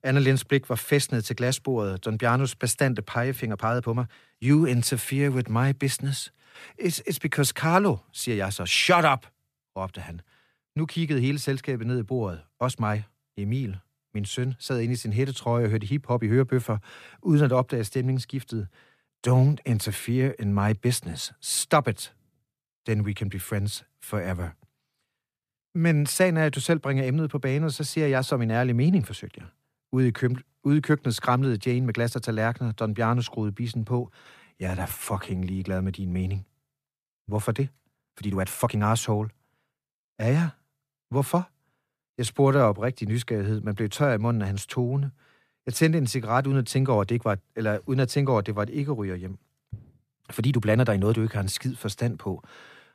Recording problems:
uneven, jittery; strongly; from 3.5 to 51 s

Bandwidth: 14.5 kHz